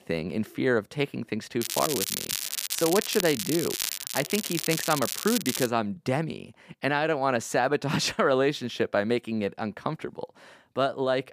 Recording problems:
crackling; loud; from 1.5 to 5.5 s; 2 dB below the speech

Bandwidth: 15 kHz